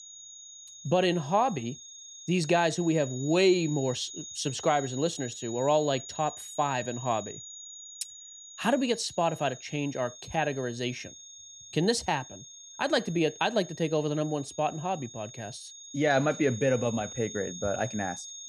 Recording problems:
high-pitched whine; noticeable; throughout; 6.5 kHz, 15 dB below the speech

